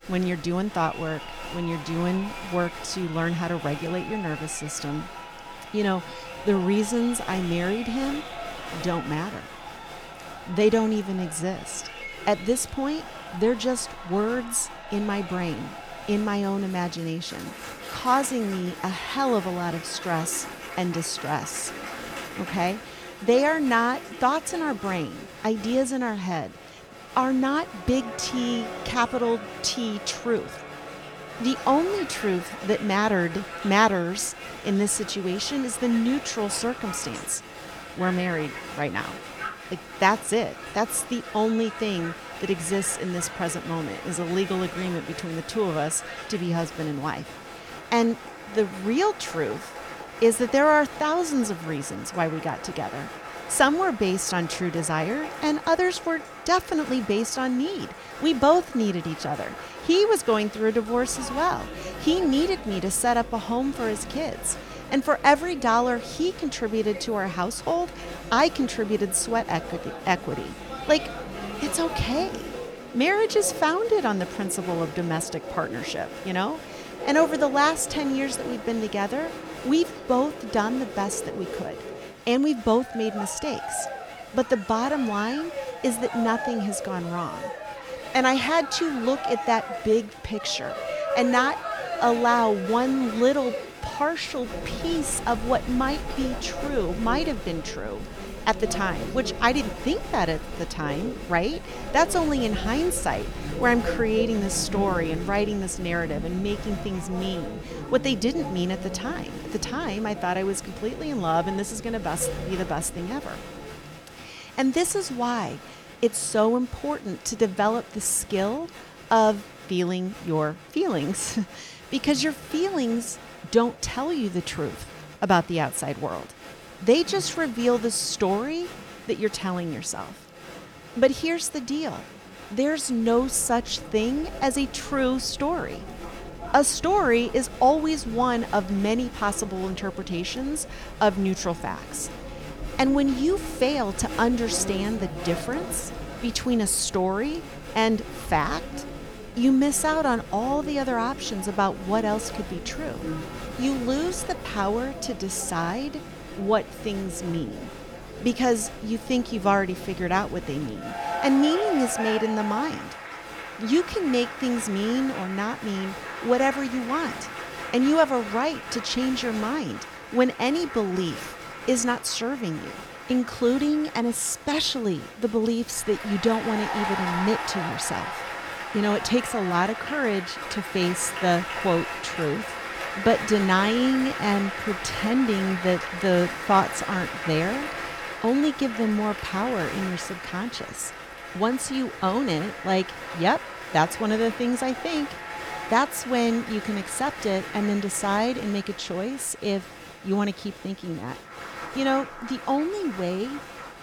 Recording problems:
crowd noise; noticeable; throughout; 10 dB below the speech

